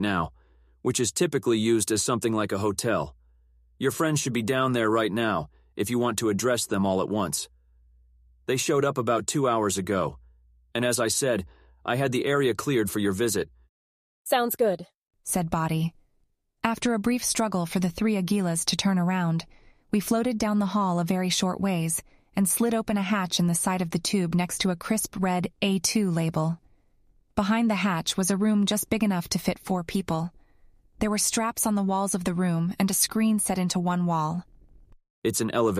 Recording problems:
abrupt cut into speech; at the start and the end

